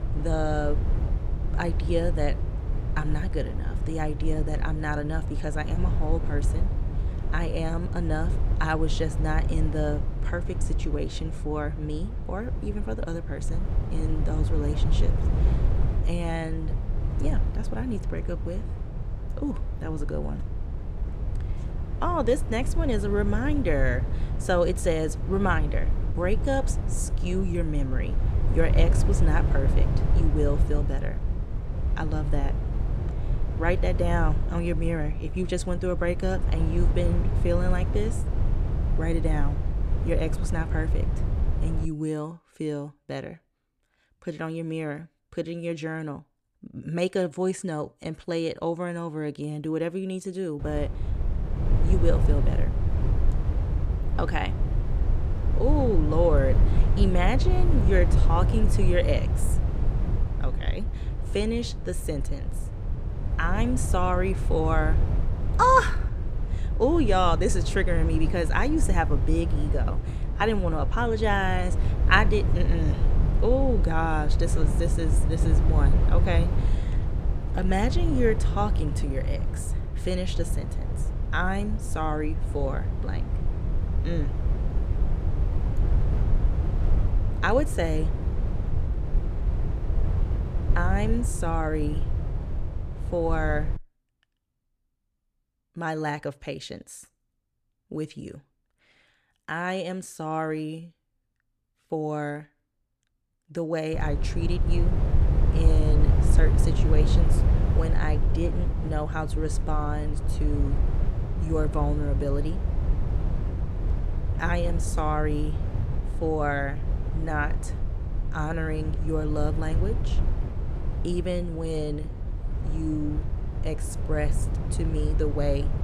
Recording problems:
wind noise on the microphone; occasional gusts; until 42 s, from 51 s to 1:34 and from 1:44 on; 10 dB below the speech

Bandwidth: 14.5 kHz